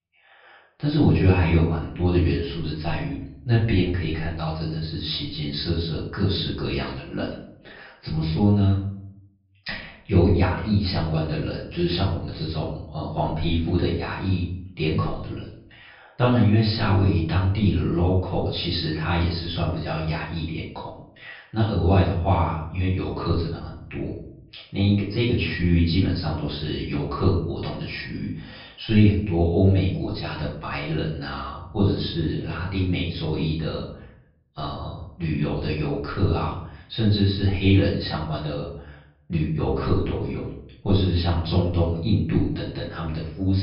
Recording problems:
off-mic speech; far
room echo; noticeable; dies away in 0.6 s
high frequencies cut off; noticeable; nothing above 5.5 kHz
abrupt cut into speech; at the end

